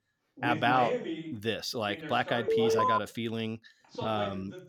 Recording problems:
voice in the background; loud; throughout; 6 dB below the speech
alarm; loud; at 2.5 s; peak 5 dB above the speech

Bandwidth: 18 kHz